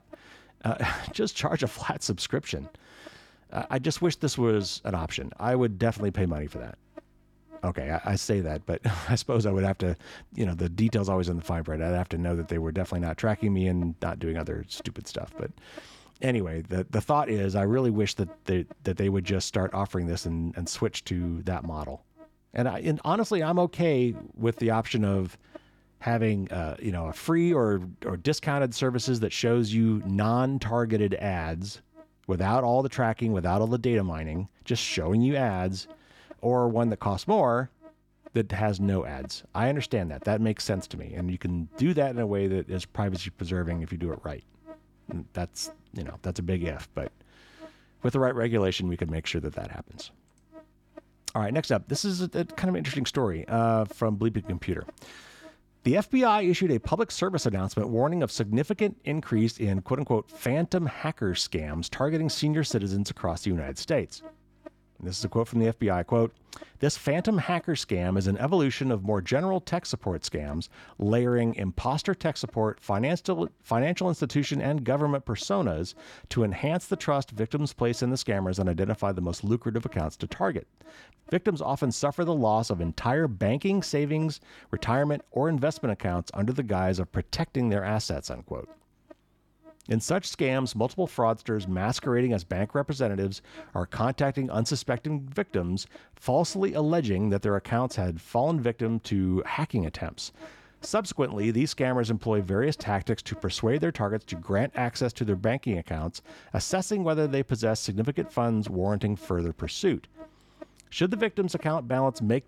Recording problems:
electrical hum; faint; throughout; 50 Hz, 25 dB below the speech

